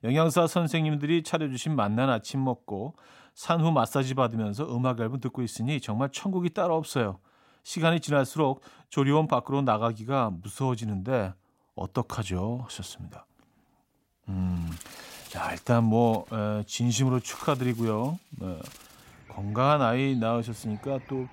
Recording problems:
animal sounds; faint; from 15 s on; 20 dB below the speech

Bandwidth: 16 kHz